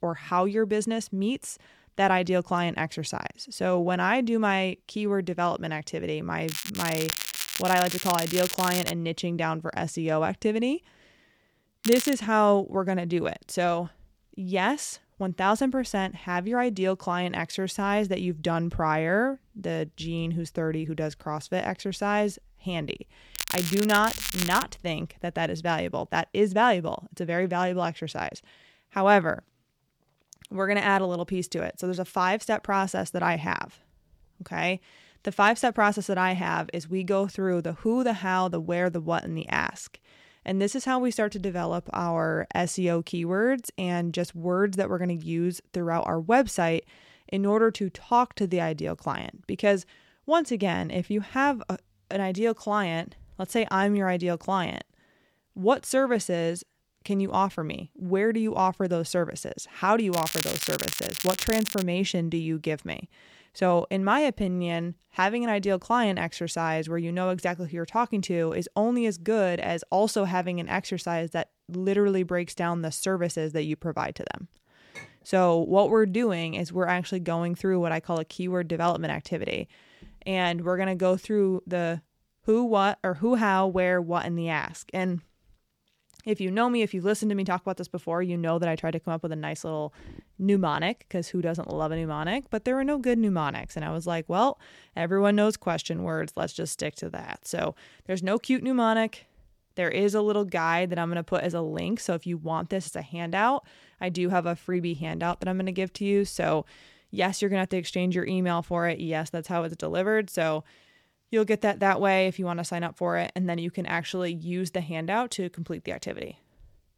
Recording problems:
crackling; loud; 4 times, first at 6.5 s; 4 dB below the speech
clattering dishes; faint; at 1:15; peak 20 dB below the speech

